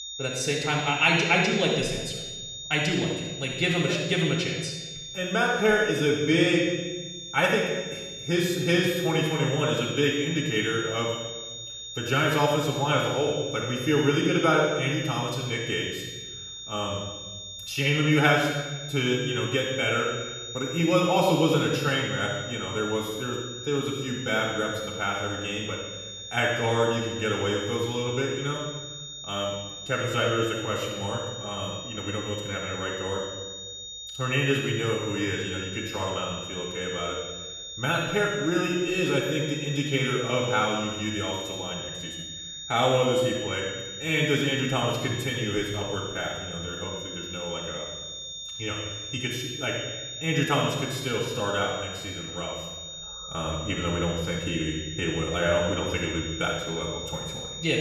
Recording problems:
off-mic speech; far
room echo; noticeable; dies away in 1.1 s
high-pitched whine; loud; throughout; 3.5 kHz, 9 dB below the speech

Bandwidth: 14.5 kHz